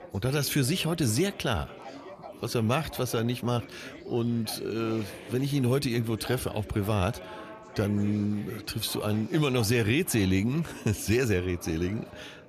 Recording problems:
chatter from many people; noticeable; throughout; 15 dB below the speech

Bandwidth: 14.5 kHz